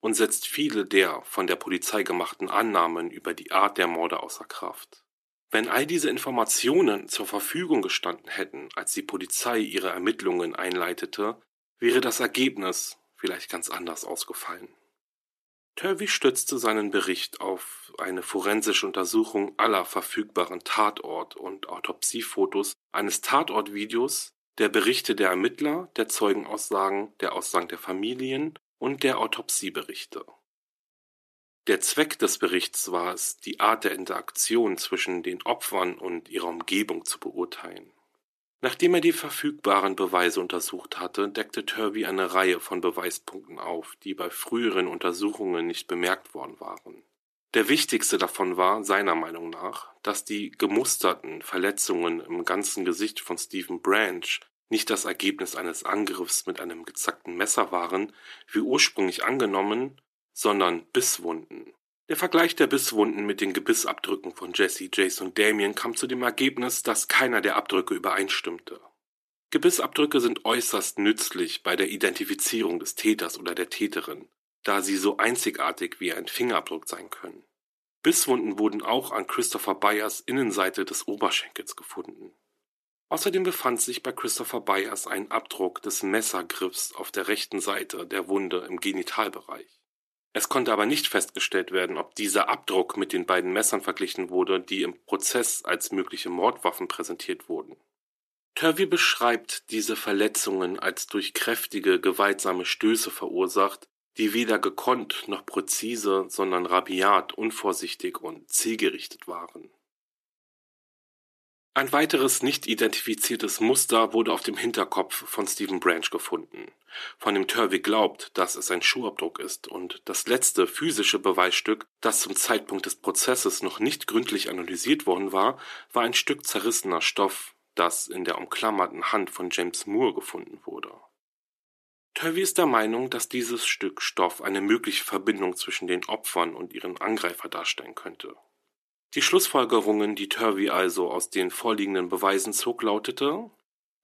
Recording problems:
thin; somewhat; fading below 350 Hz

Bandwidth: 13.5 kHz